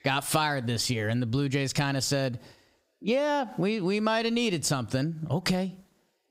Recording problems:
squashed, flat; heavily

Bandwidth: 15.5 kHz